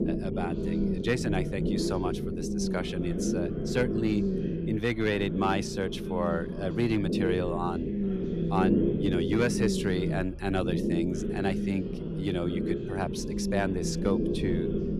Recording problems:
low rumble; loud; throughout; 3 dB below the speech
background music; noticeable; throughout; 20 dB below the speech
voice in the background; faint; throughout; 20 dB below the speech

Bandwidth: 14.5 kHz